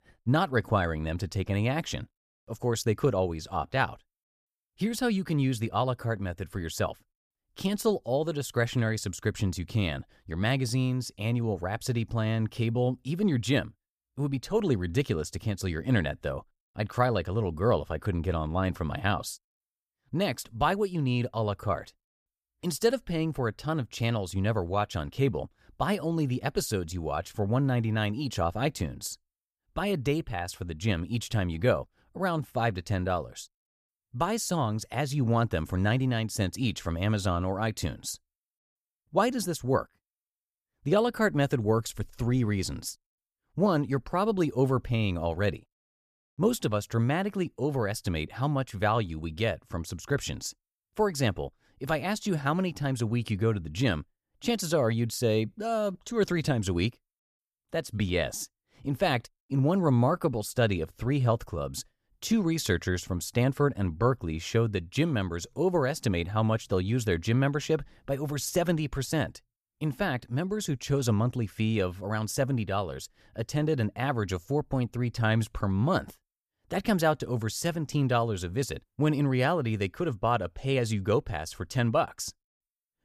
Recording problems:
none

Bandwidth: 14.5 kHz